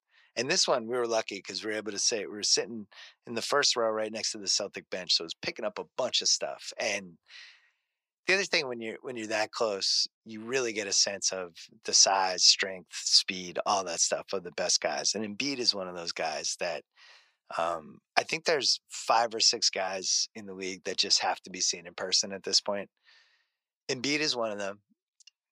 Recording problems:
thin; very; fading below 650 Hz

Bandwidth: 15 kHz